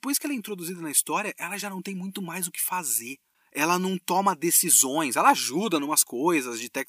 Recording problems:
thin; somewhat; fading below 600 Hz

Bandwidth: 15 kHz